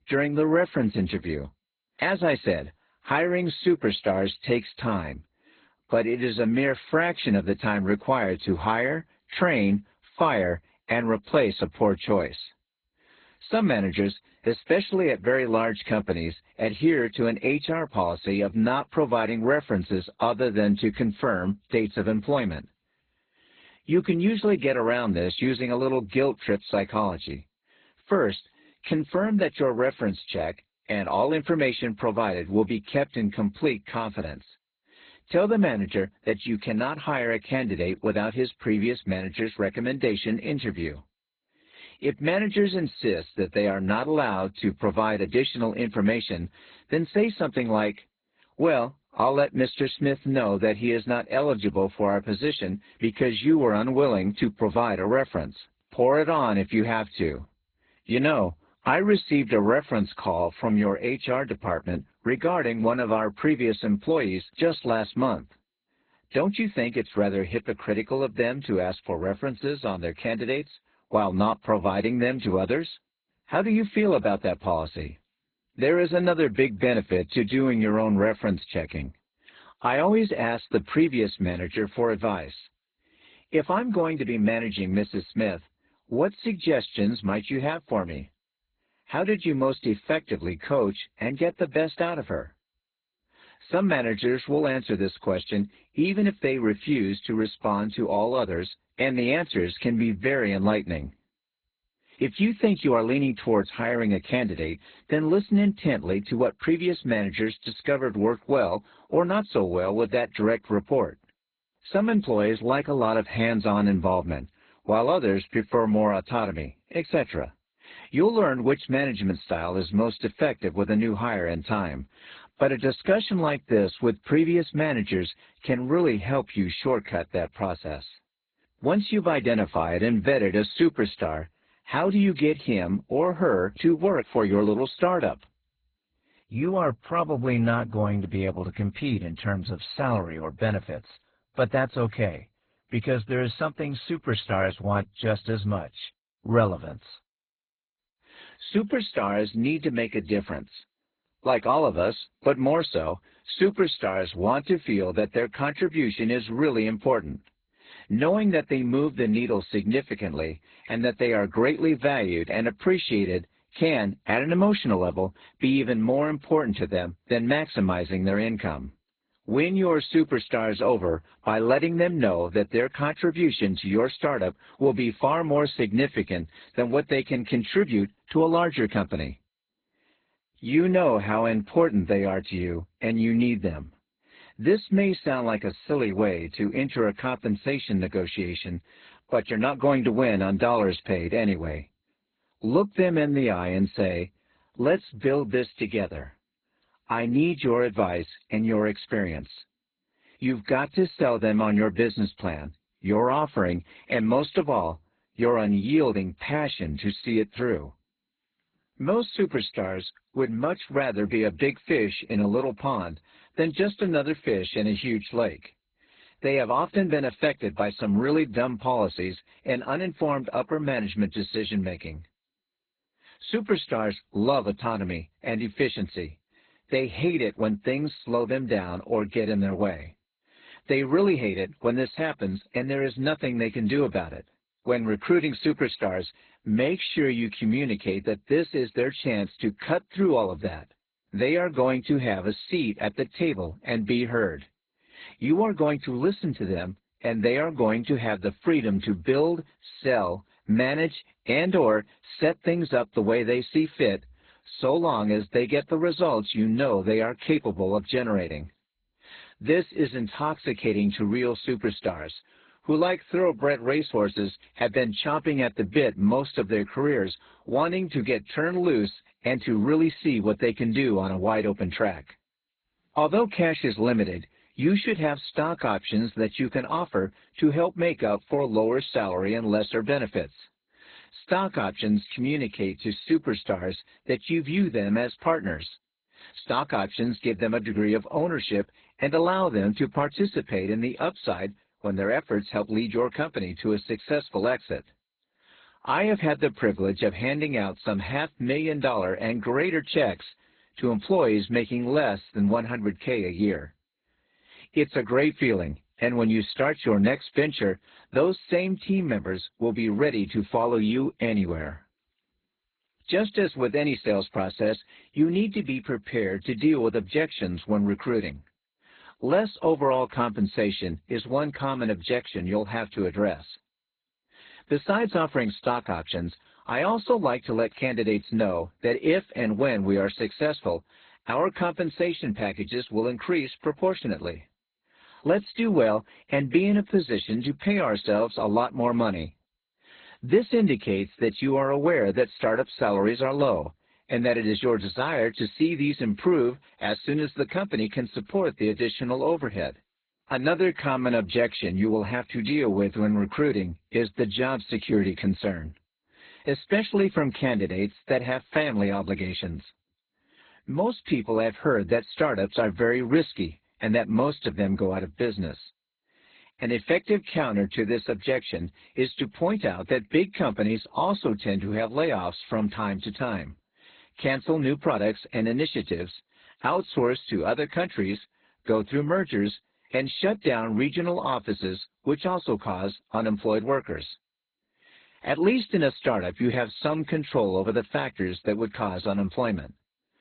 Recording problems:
garbled, watery; badly; nothing above 4 kHz

